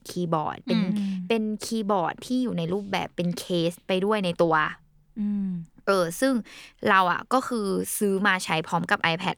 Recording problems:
none

